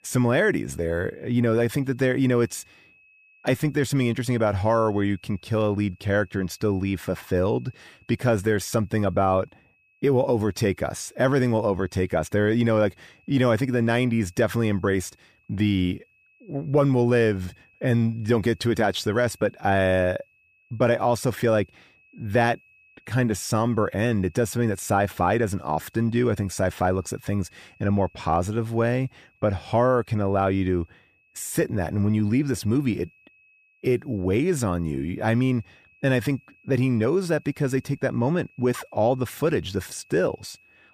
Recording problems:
high-pitched whine; faint; throughout; 2.5 kHz, 35 dB below the speech

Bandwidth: 15 kHz